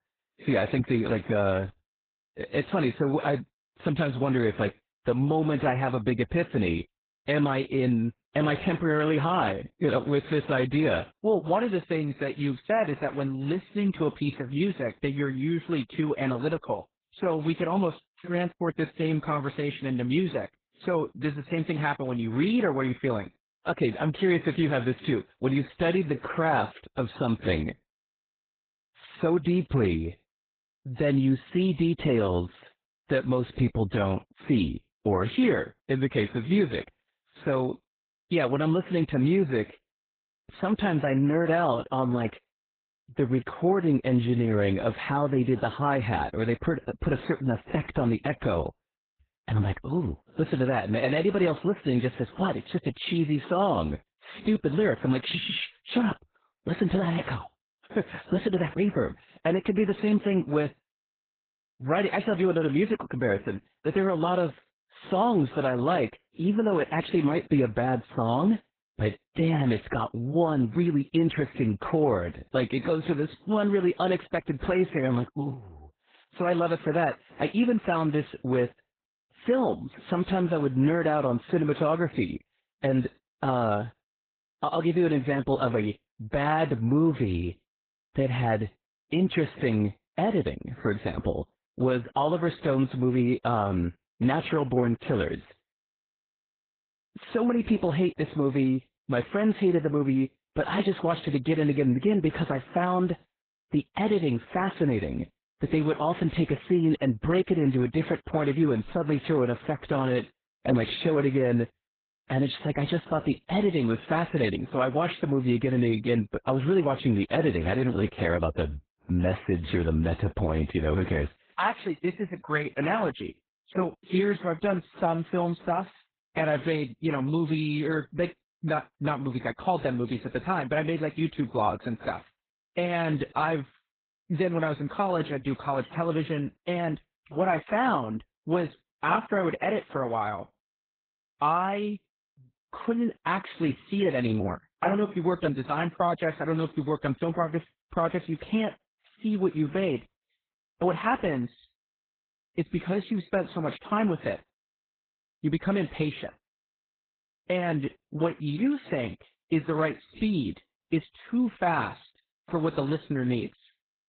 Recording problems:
garbled, watery; badly; nothing above 4 kHz

